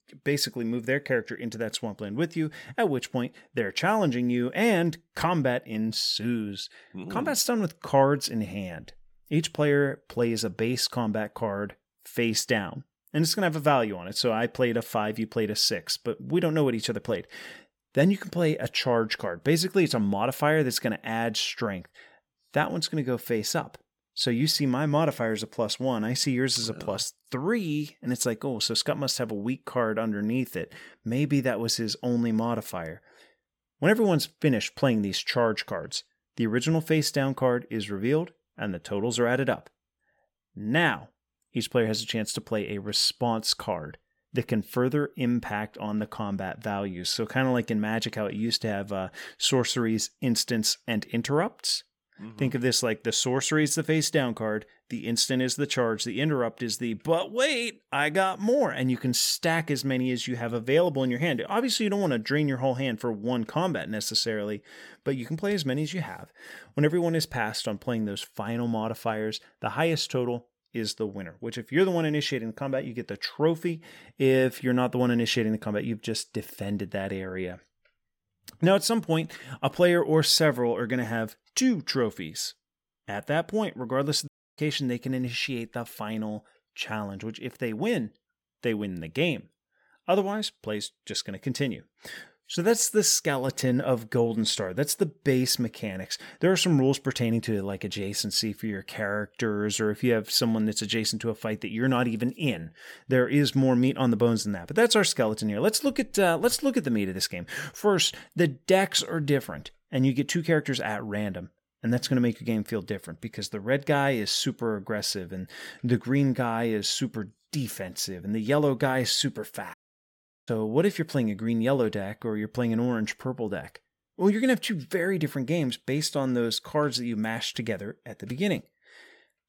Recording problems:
audio cutting out; at 1:24 and at 2:00 for 0.5 s

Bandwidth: 17.5 kHz